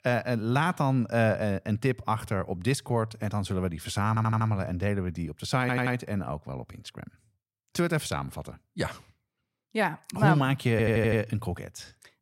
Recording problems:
audio stuttering; at 4 s, at 5.5 s and at 11 s

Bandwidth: 16 kHz